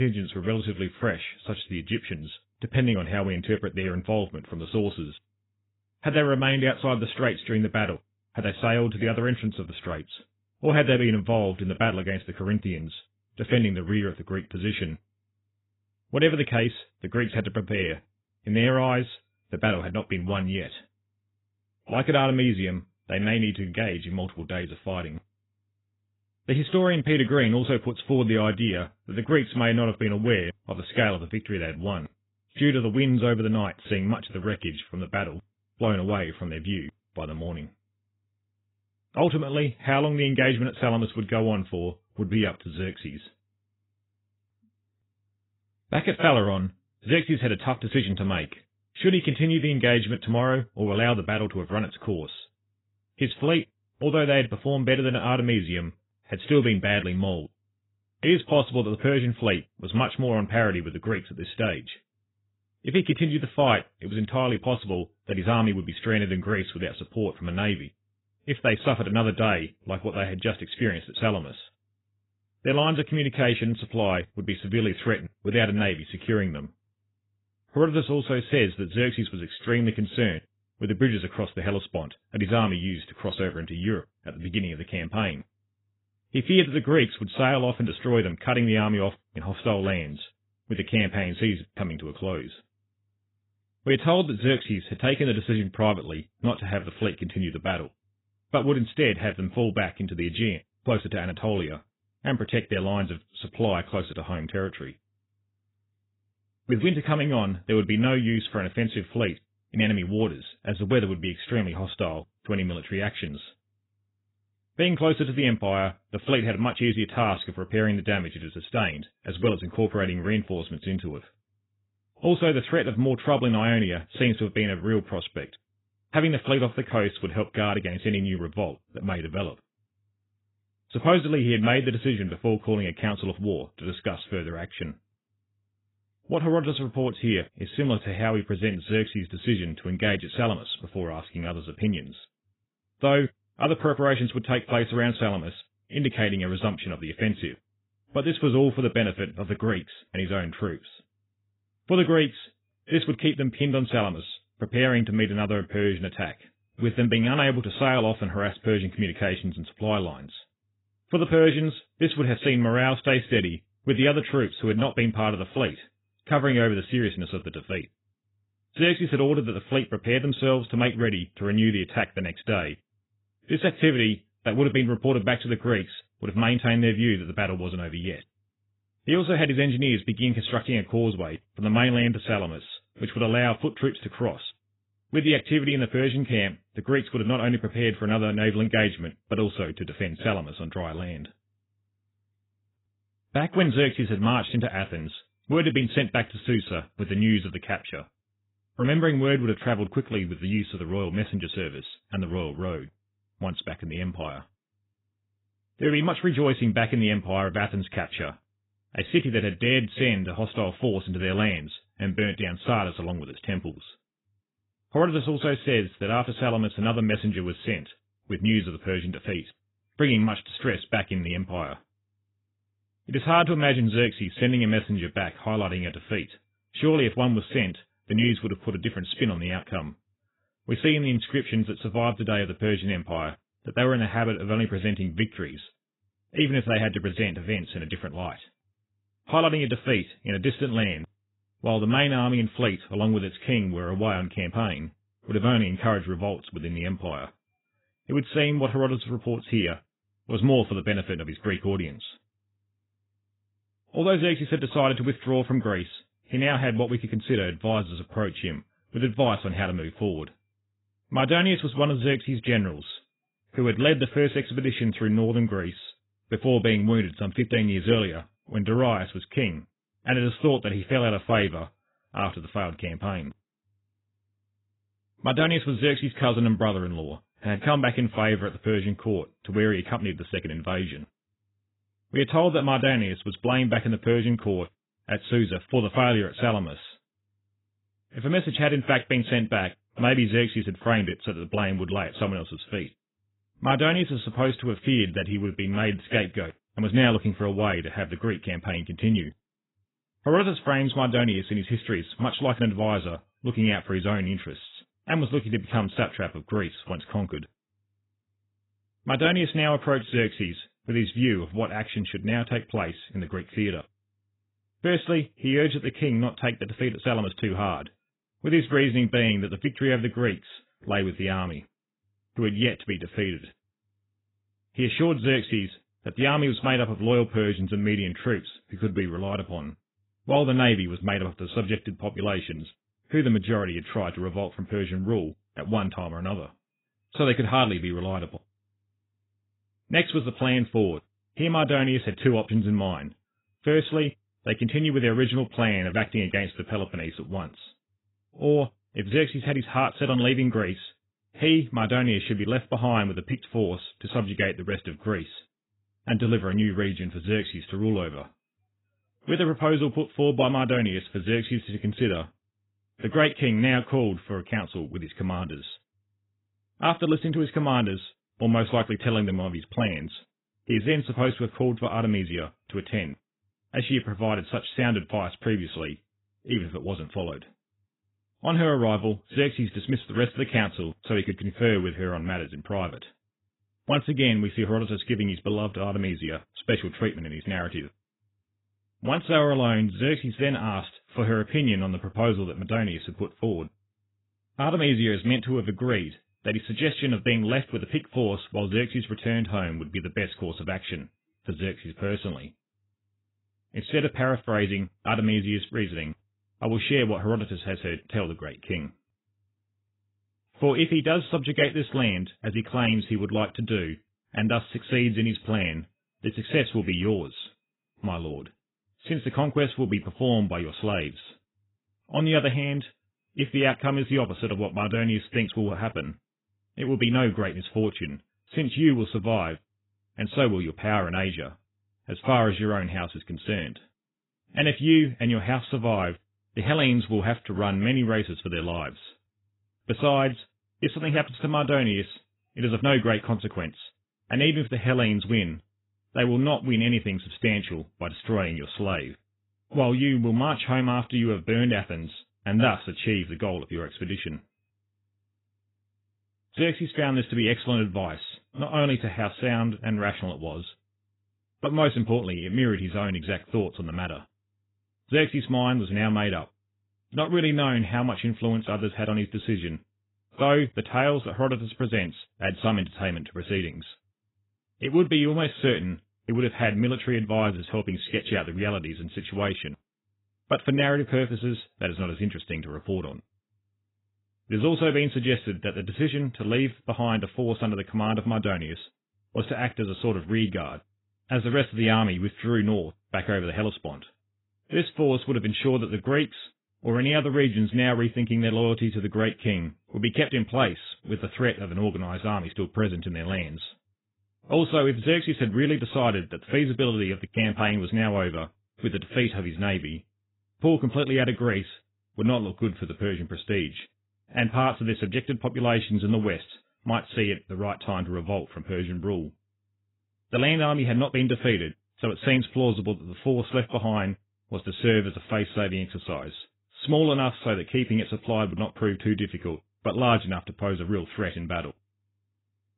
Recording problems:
garbled, watery; badly; nothing above 4 kHz
abrupt cut into speech; at the start

